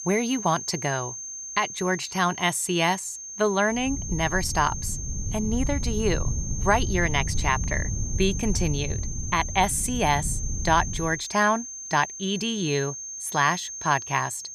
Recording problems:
high-pitched whine; loud; throughout; 6.5 kHz, 8 dB below the speech
wind noise on the microphone; occasional gusts; from 4 to 11 s; 20 dB below the speech

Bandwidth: 14 kHz